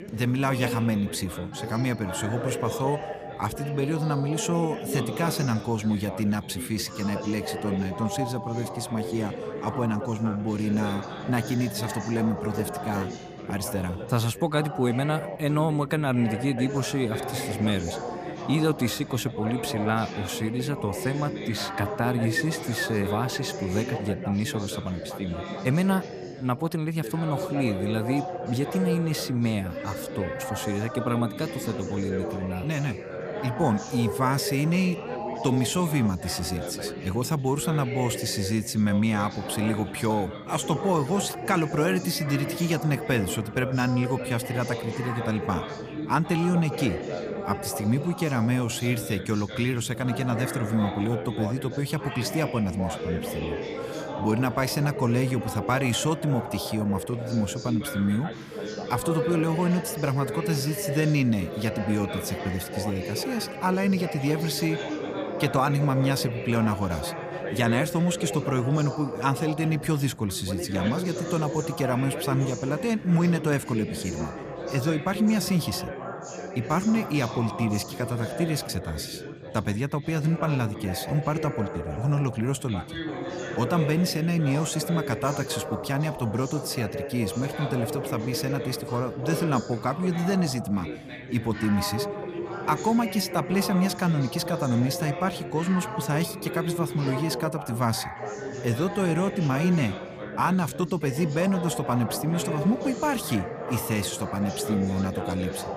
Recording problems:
background chatter; loud; throughout; 4 voices, 7 dB below the speech

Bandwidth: 15 kHz